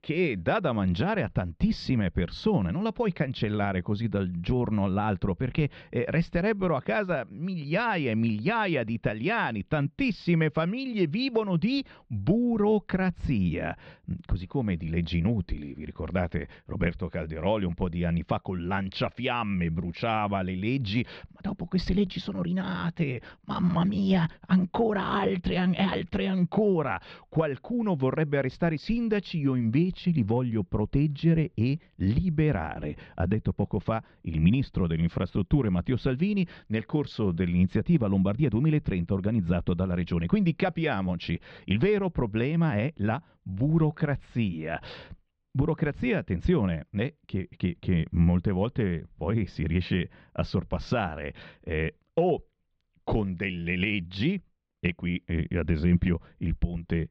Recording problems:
muffled; slightly; fading above 3.5 kHz

